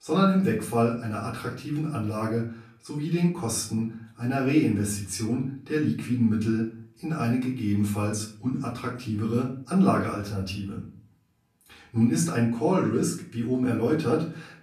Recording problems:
off-mic speech; far
room echo; slight; dies away in 0.4 s

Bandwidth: 14.5 kHz